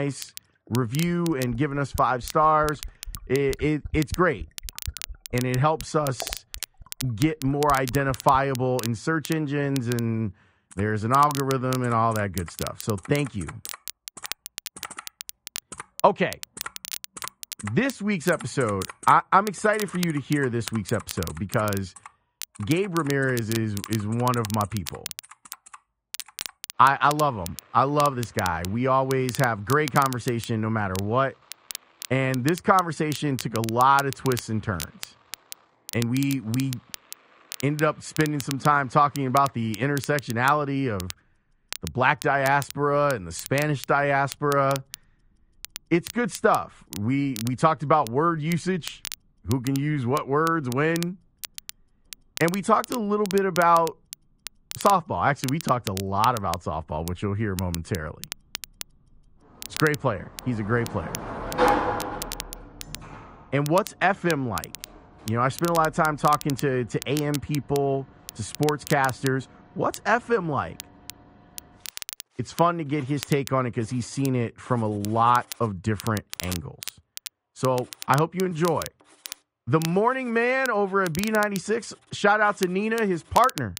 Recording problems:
muffled; slightly; fading above 3 kHz
garbled, watery; slightly; nothing above 10.5 kHz
household noises; noticeable; throughout; 15 dB below the speech
crackle, like an old record; noticeable; 15 dB below the speech
abrupt cut into speech; at the start

